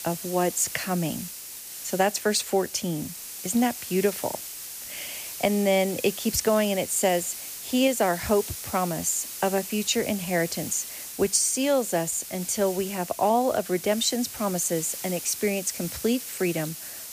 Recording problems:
hiss; loud; throughout; 9 dB below the speech

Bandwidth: 15 kHz